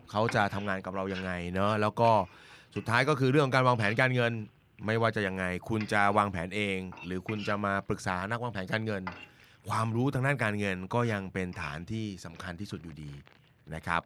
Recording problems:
household noises; noticeable; throughout; 20 dB below the speech

